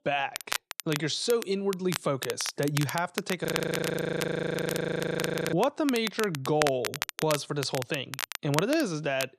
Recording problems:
crackle, like an old record; loud; 7 dB below the speech
audio freezing; at 3.5 s for 2 s

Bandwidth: 14 kHz